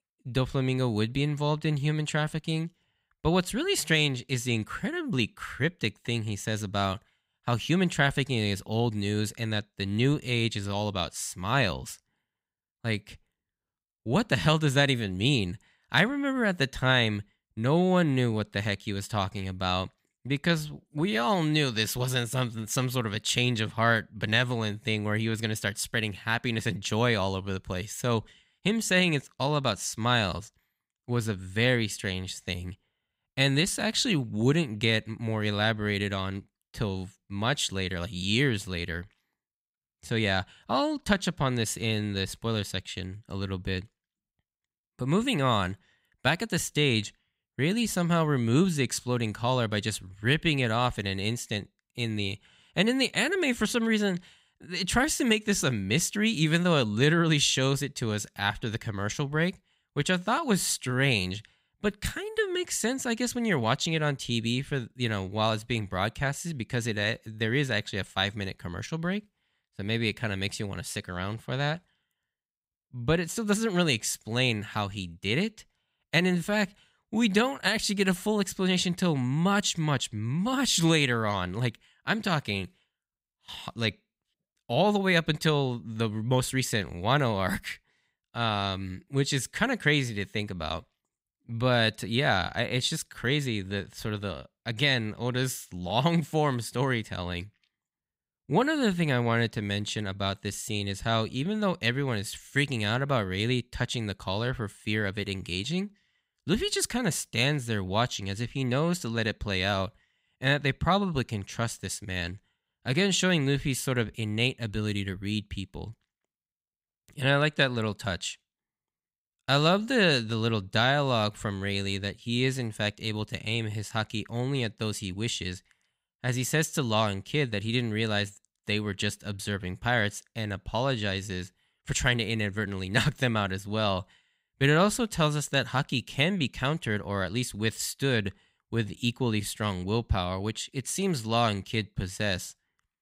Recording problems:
none

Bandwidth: 15.5 kHz